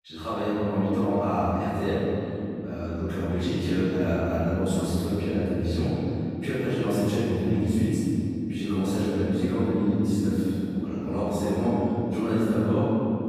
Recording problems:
room echo; strong; dies away in 3 s
off-mic speech; far

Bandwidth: 15 kHz